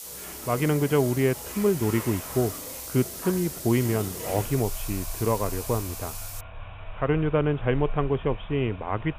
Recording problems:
high frequencies cut off; severe; nothing above 3.5 kHz
hiss; loud; until 6.5 s; 9 dB below the speech
rain or running water; noticeable; throughout; 15 dB below the speech

